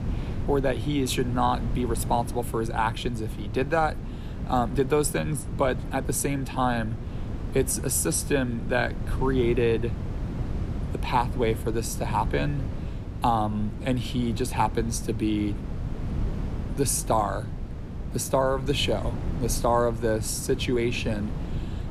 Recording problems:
wind noise on the microphone; occasional gusts; 15 dB below the speech

